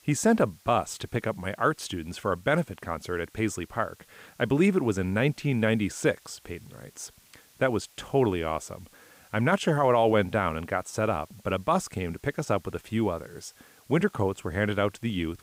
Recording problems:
hiss; faint; throughout; 30 dB below the speech

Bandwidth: 15.5 kHz